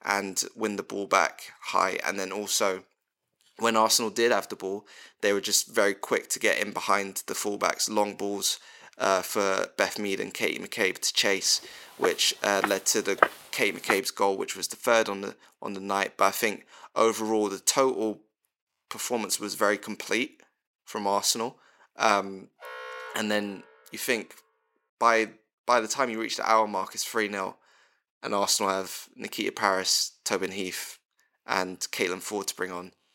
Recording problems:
thin; somewhat; fading below 450 Hz
footsteps; loud; from 12 to 14 s; peak 2 dB above the speech
alarm; faint; from 23 to 24 s; peak 10 dB below the speech

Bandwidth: 16.5 kHz